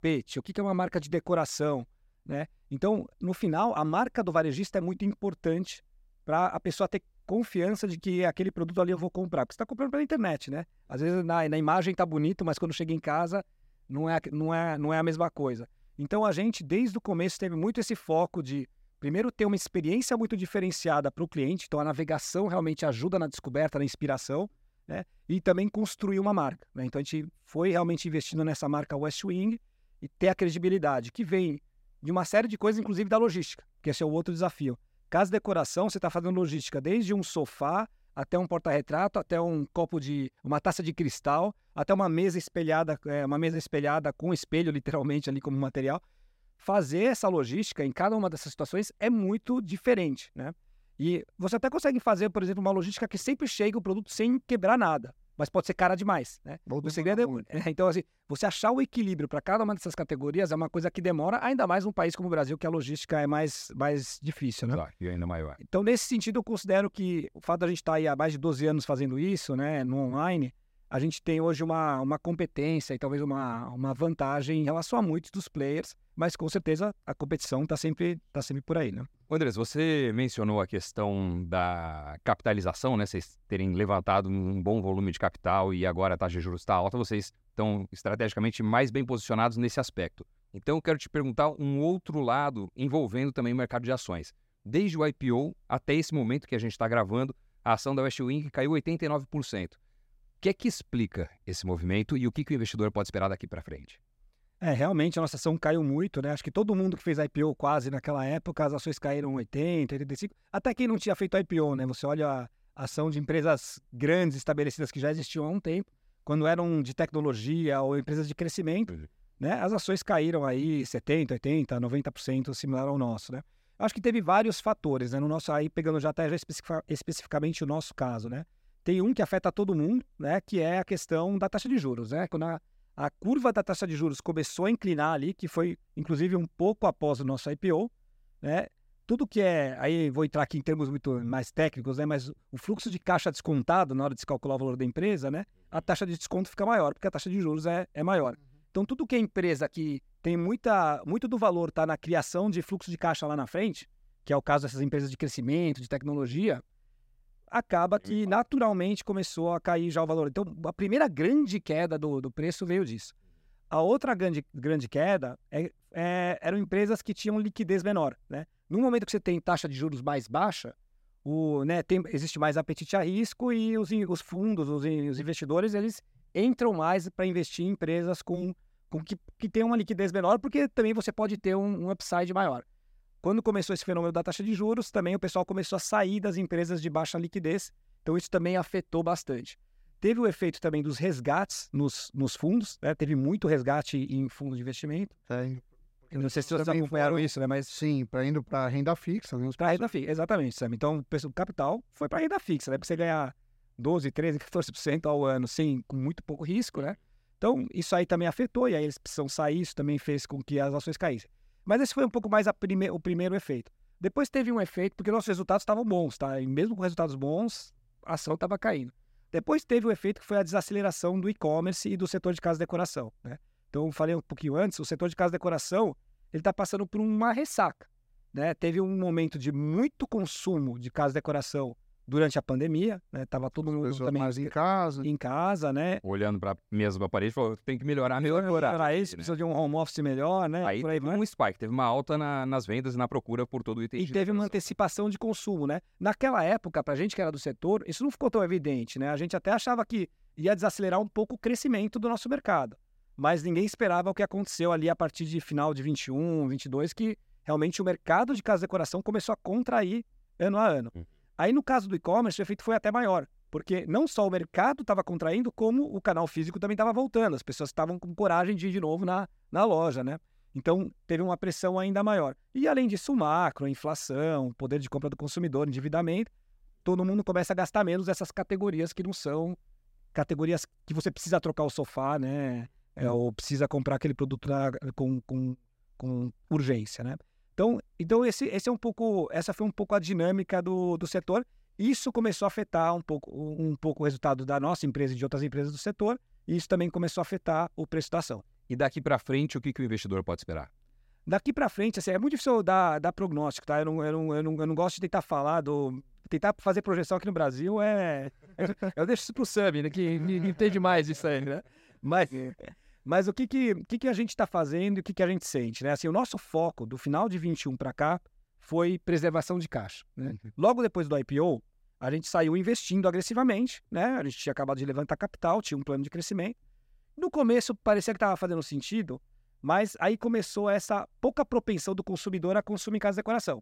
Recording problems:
none

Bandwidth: 16 kHz